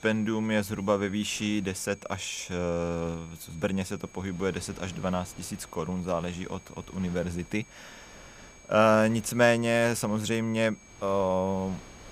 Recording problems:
wind noise on the microphone; occasional gusts; 25 dB below the speech
high-pitched whine; faint; throughout; 6.5 kHz, 25 dB below the speech

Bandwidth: 15.5 kHz